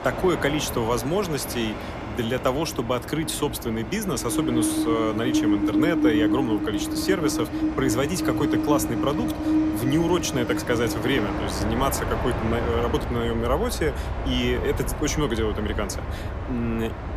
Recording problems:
train or aircraft noise; loud; throughout; 1 dB below the speech

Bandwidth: 14.5 kHz